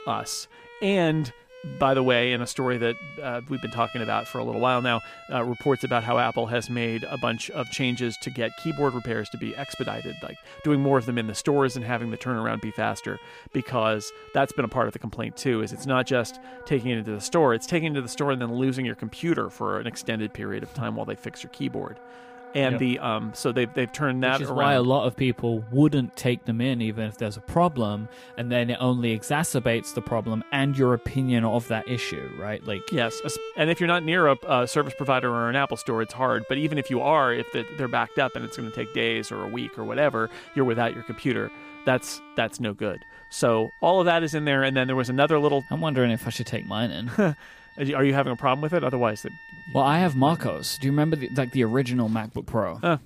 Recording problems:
background music; noticeable; throughout; 20 dB below the speech

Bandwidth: 15 kHz